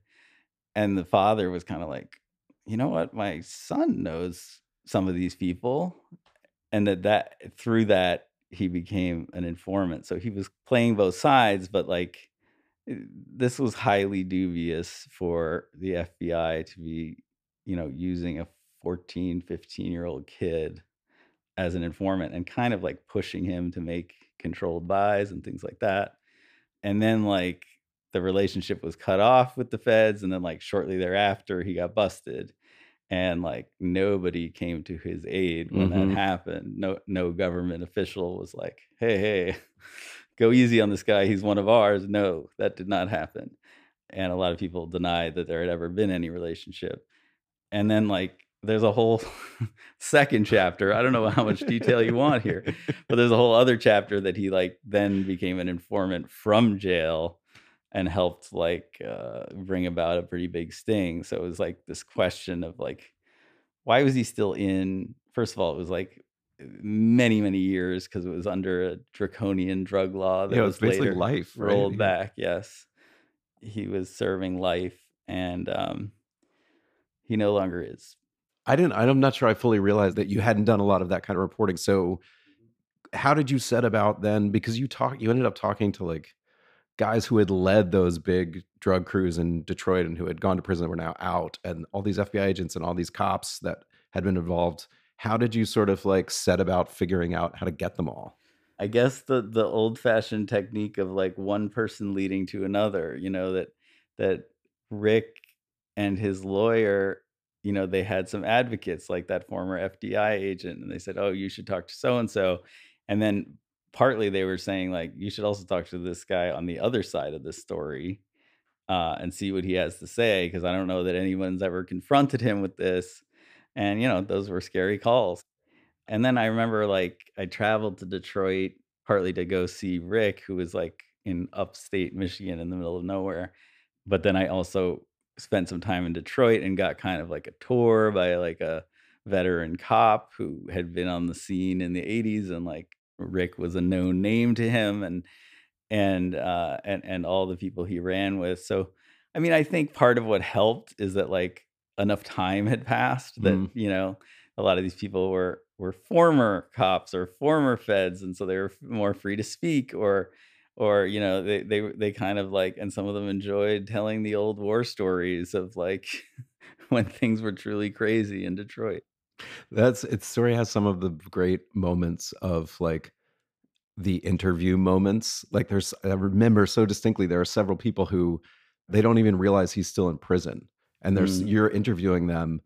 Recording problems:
none

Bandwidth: 15 kHz